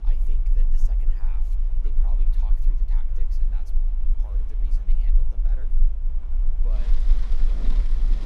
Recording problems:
rain or running water; very loud; throughout; 4 dB above the speech
low rumble; loud; throughout; as loud as the speech

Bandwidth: 14.5 kHz